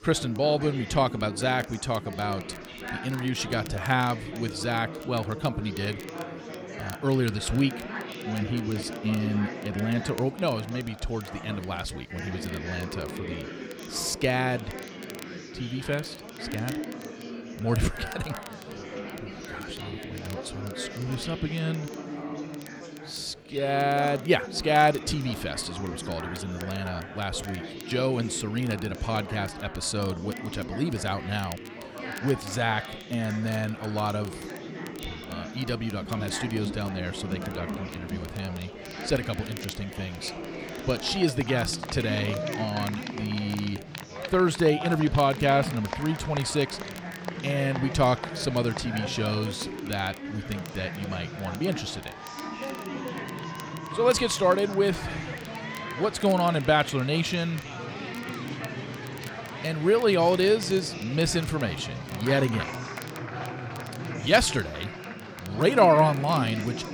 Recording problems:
chatter from many people; loud; throughout; 9 dB below the speech
crackle, like an old record; faint; 20 dB below the speech

